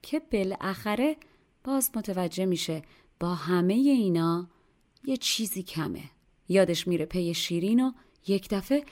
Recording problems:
none

